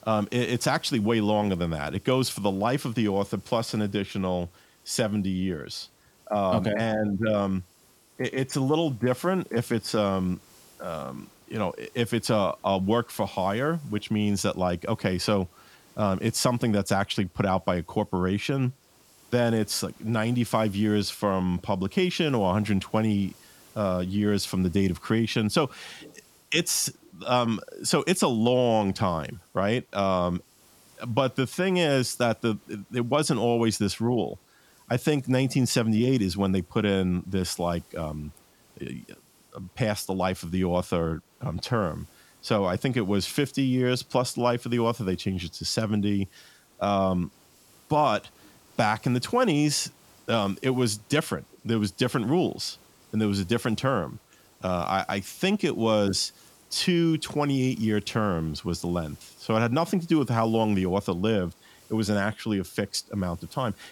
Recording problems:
hiss; faint; throughout; 30 dB below the speech

